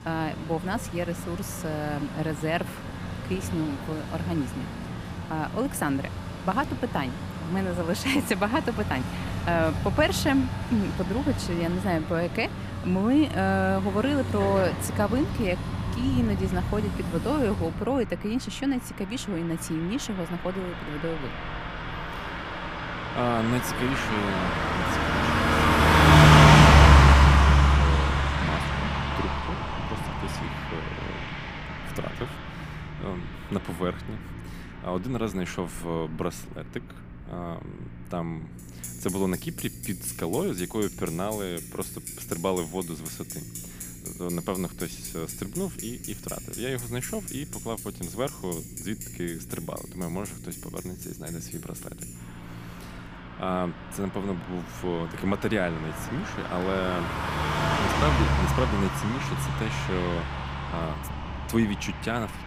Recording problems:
traffic noise; very loud; throughout; 5 dB above the speech
low rumble; faint; throughout; 20 dB below the speech

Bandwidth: 15 kHz